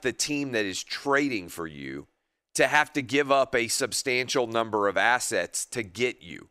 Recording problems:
none

